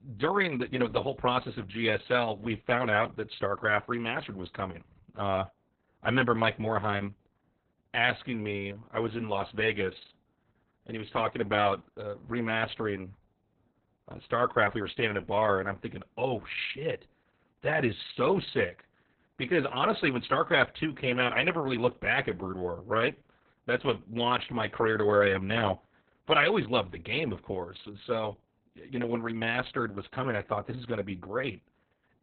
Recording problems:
garbled, watery; badly; nothing above 4 kHz

